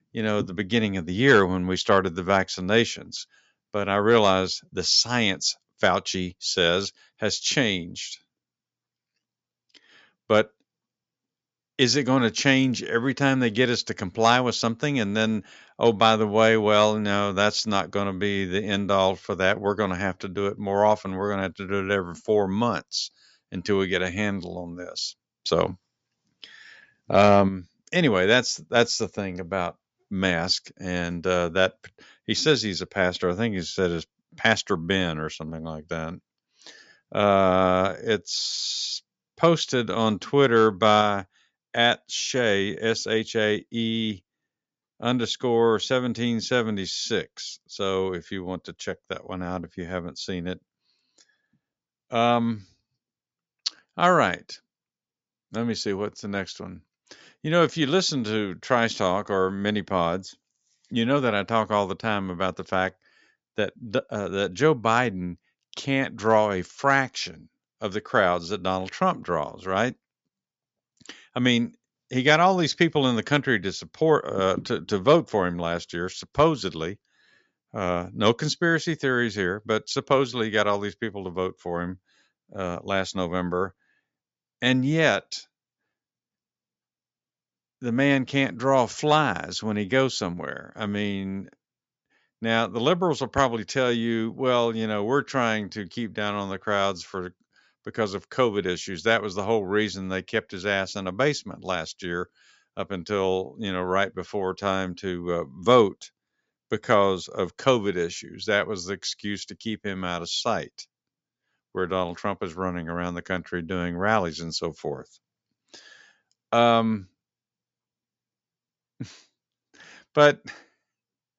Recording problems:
high frequencies cut off; noticeable; nothing above 7.5 kHz

